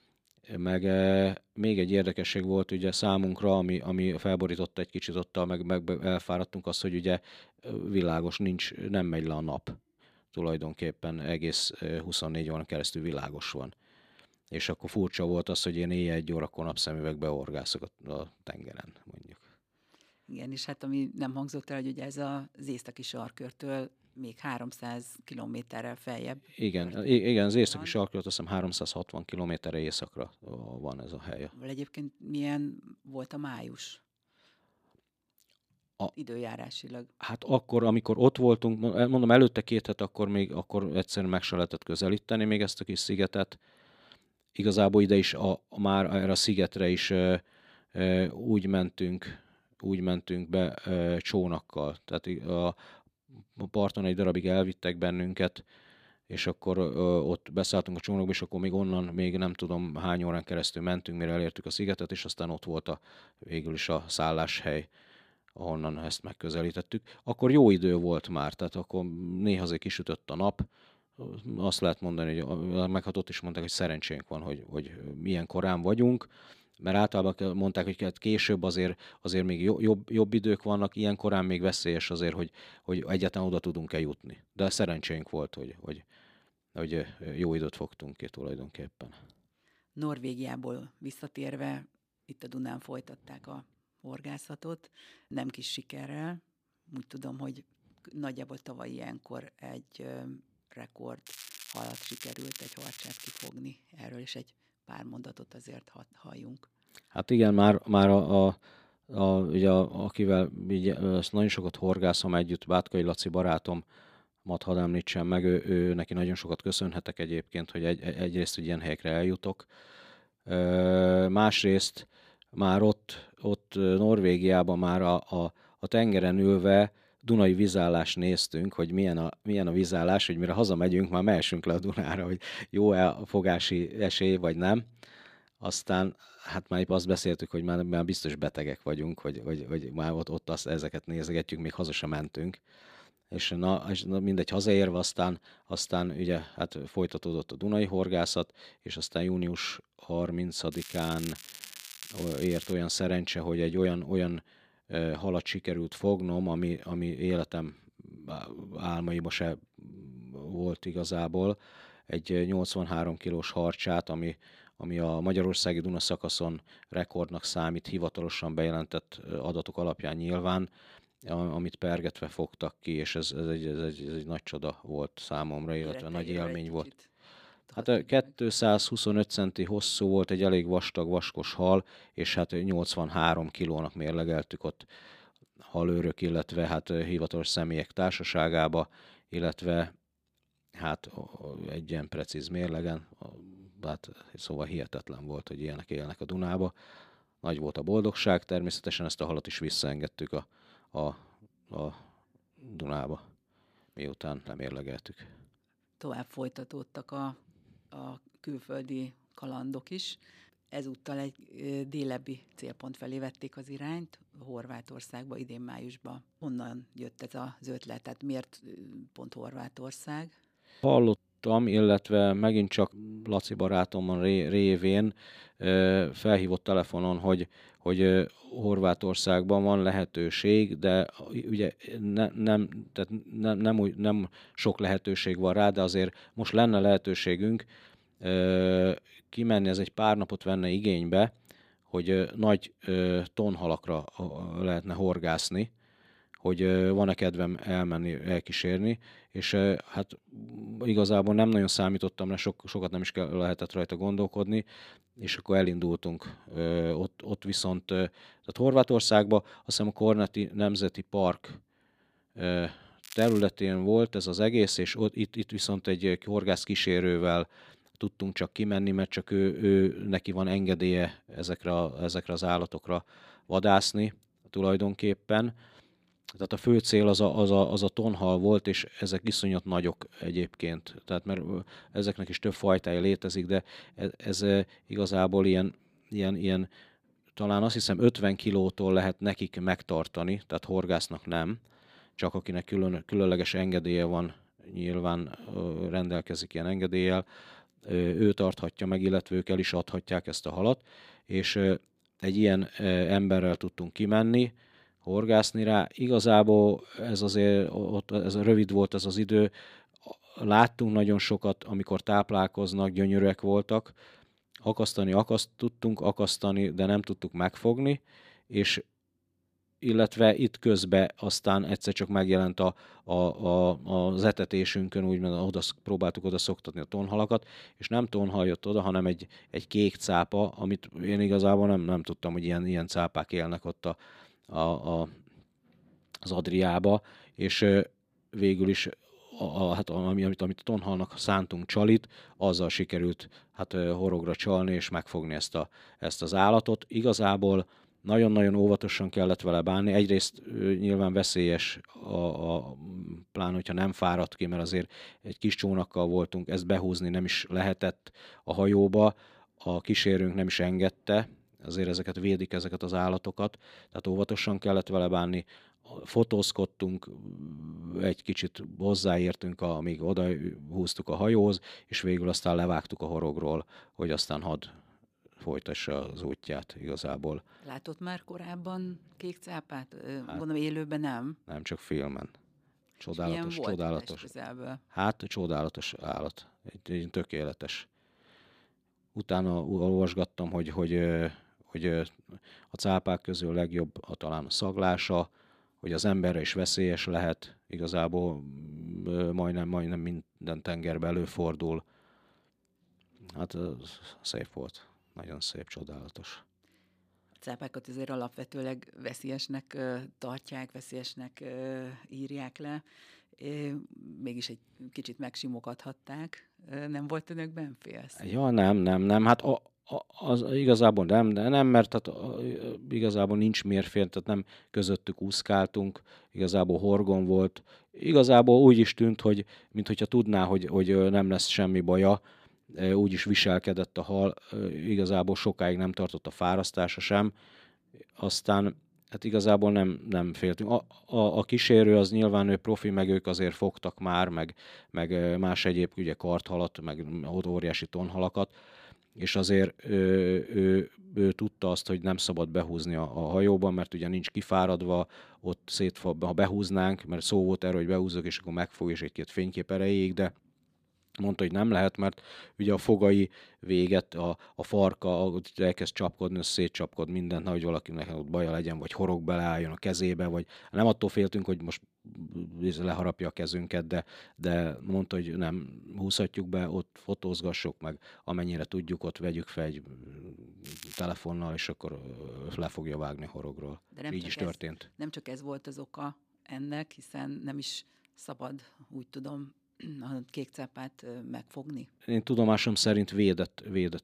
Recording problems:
crackling; noticeable; 4 times, first at 1:41; 15 dB below the speech

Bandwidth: 15 kHz